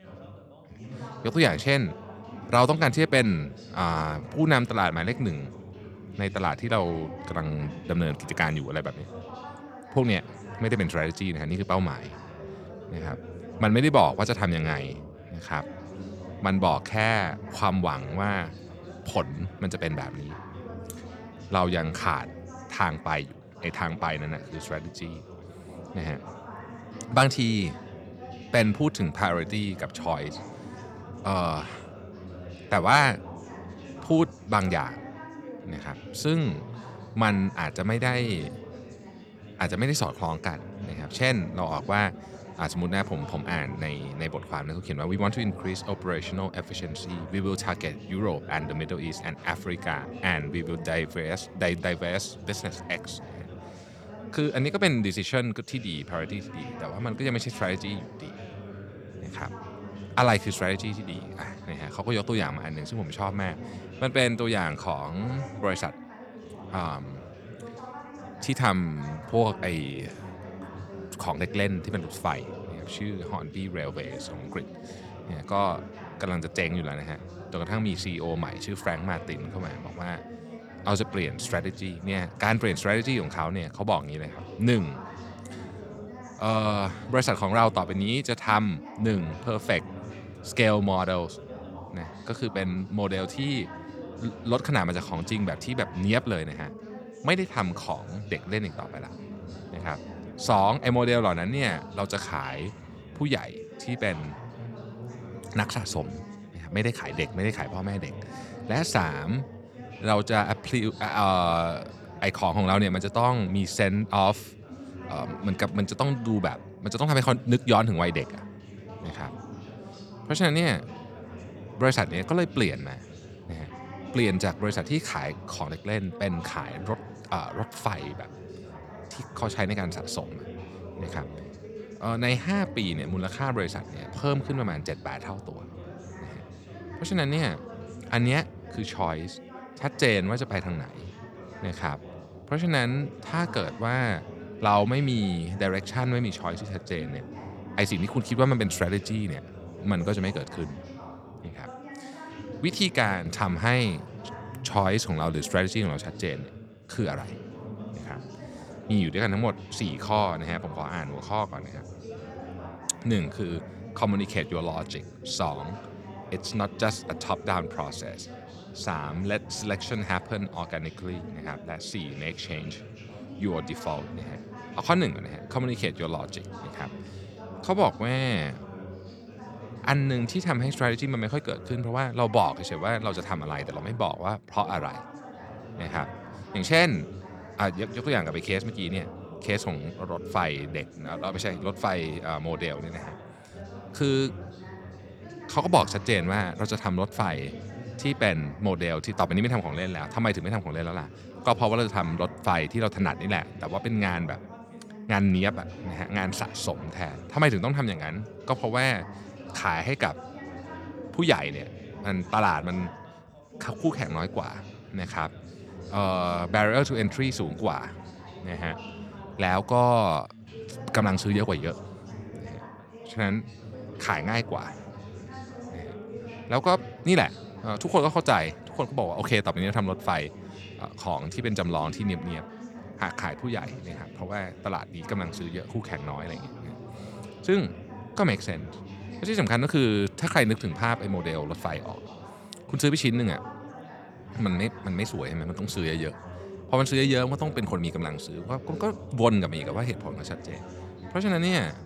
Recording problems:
background chatter; noticeable; throughout; 3 voices, 15 dB below the speech

